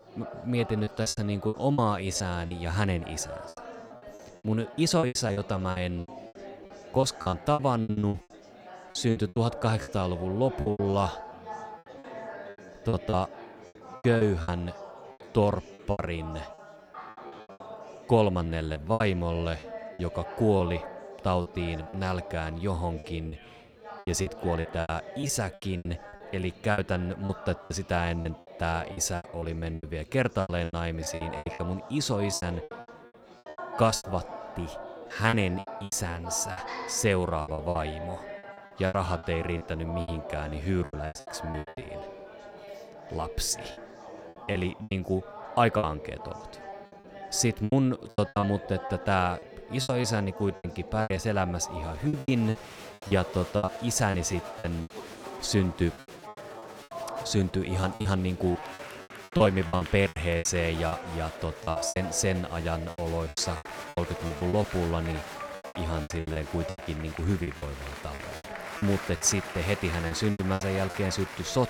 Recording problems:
chatter from many people; noticeable; throughout; 10 dB below the speech
choppy; very; 15% of the speech affected

